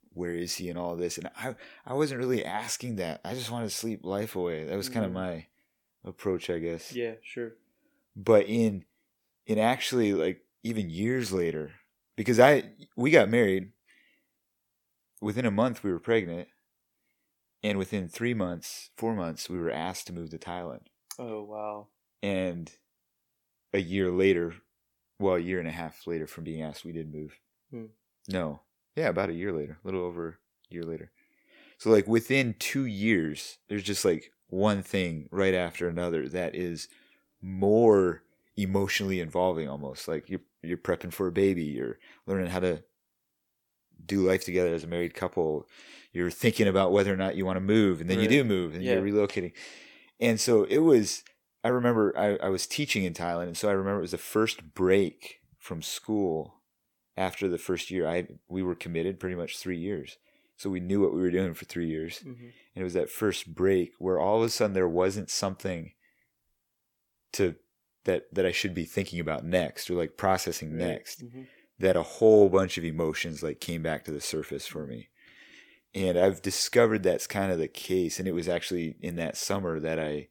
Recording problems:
none

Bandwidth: 17.5 kHz